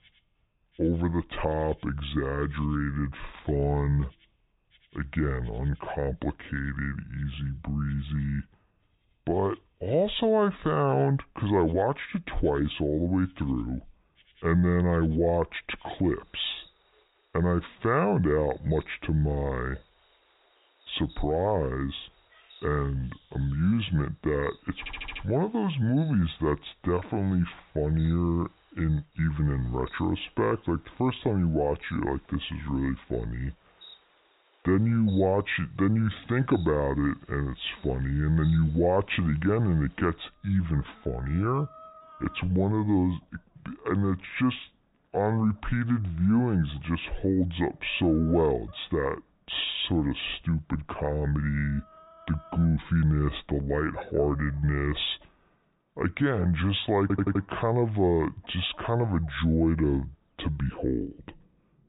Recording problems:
high frequencies cut off; severe; nothing above 4 kHz
wrong speed and pitch; too slow and too low; 0.7 times normal speed
animal sounds; faint; throughout; 30 dB below the speech
audio stuttering; at 25 s and at 57 s

